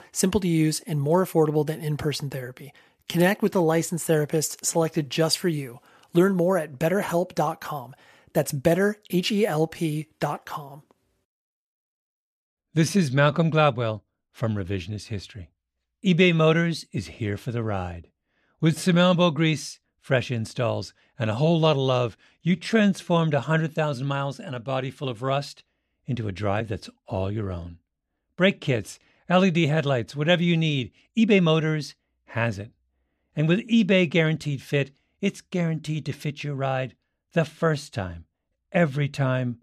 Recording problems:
uneven, jittery; strongly; from 3 to 37 s

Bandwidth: 14.5 kHz